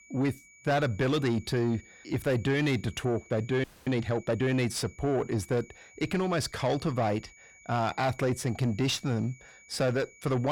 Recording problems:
distortion; slight; 10 dB below the speech
high-pitched whine; faint; throughout; 2.5 kHz, 25 dB below the speech
audio freezing; at 3.5 s
abrupt cut into speech; at the end

